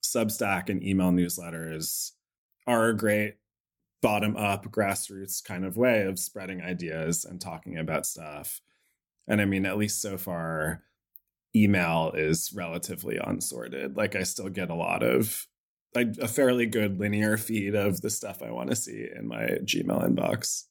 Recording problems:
none

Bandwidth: 17 kHz